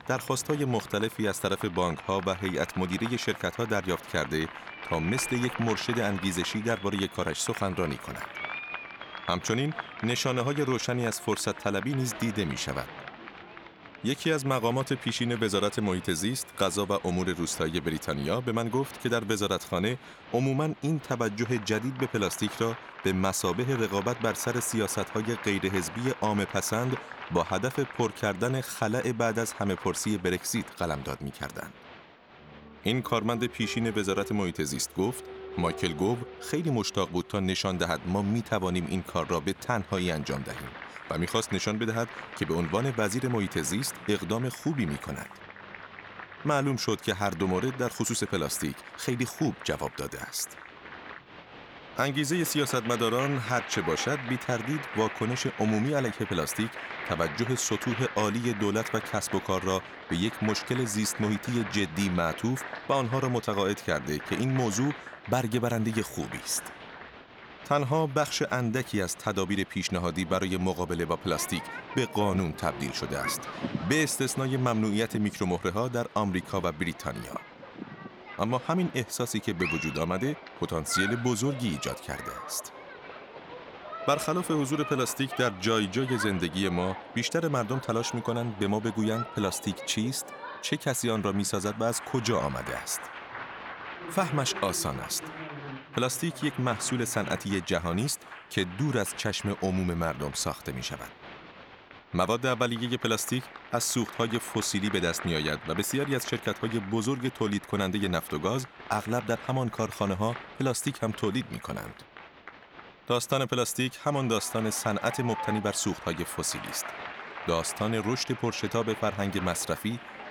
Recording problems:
crowd noise; noticeable; throughout; 10 dB below the speech

